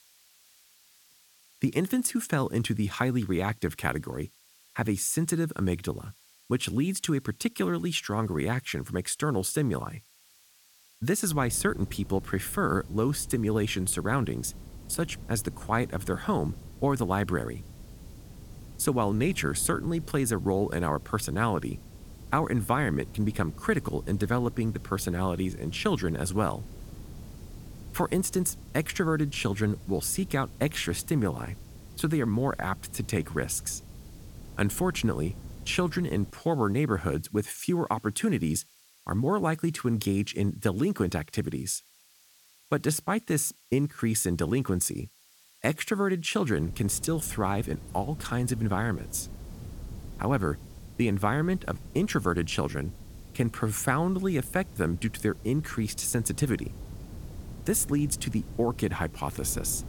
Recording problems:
wind noise on the microphone; occasional gusts; from 11 to 36 s and from 47 s on; 25 dB below the speech
hiss; faint; throughout; 30 dB below the speech

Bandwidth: 17.5 kHz